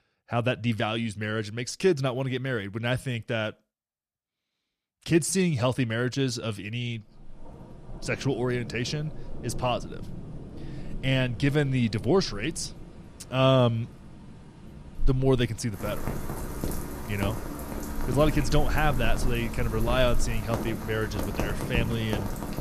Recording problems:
rain or running water; loud; from 7 s on; 9 dB below the speech

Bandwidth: 14.5 kHz